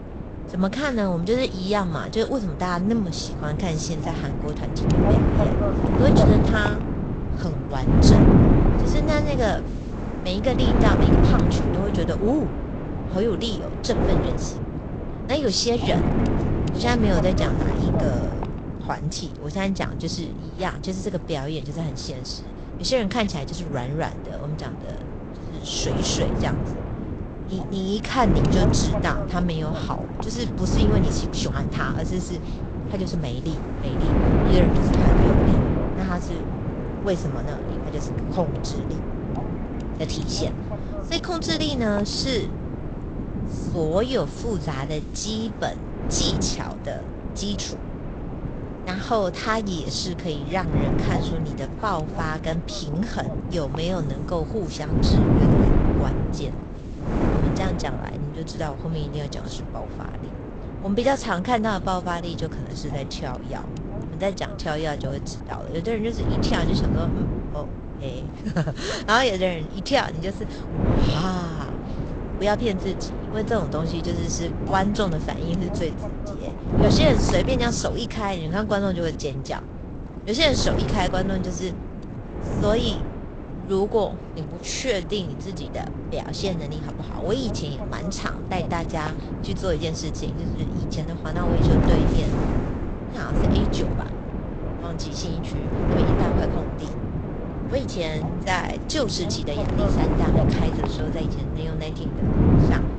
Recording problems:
garbled, watery; slightly; nothing above 7.5 kHz
wind noise on the microphone; heavy; 3 dB below the speech

